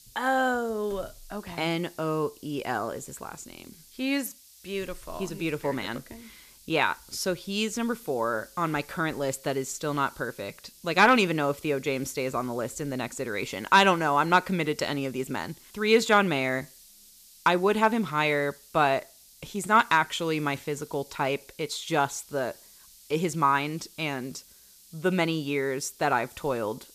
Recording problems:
hiss; faint; throughout; 25 dB below the speech

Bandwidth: 14.5 kHz